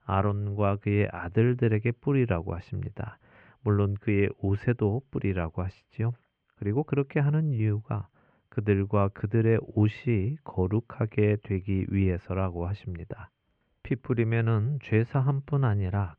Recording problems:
muffled; very; fading above 2.5 kHz

